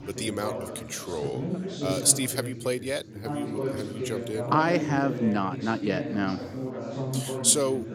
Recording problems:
background chatter; loud; throughout; 4 voices, 6 dB below the speech

